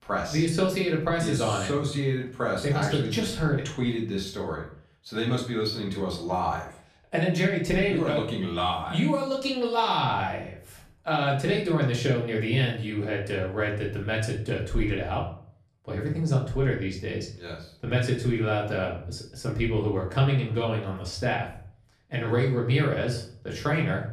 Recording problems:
off-mic speech; far
room echo; slight; dies away in 0.4 s

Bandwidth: 14.5 kHz